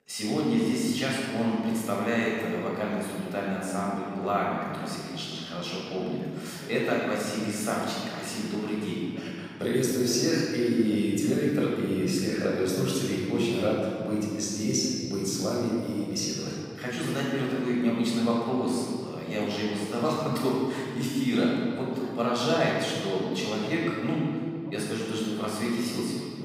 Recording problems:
room echo; strong; dies away in 2.4 s
off-mic speech; far
voice in the background; faint; throughout; 25 dB below the speech

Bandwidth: 15.5 kHz